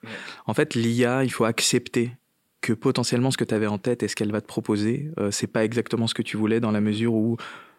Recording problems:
none

